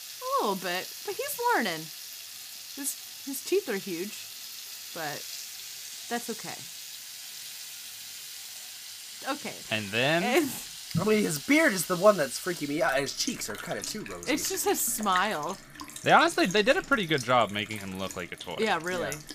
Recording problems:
household noises; noticeable; throughout; 10 dB below the speech

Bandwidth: 15 kHz